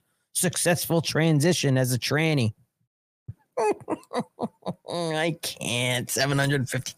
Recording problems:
none

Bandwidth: 15 kHz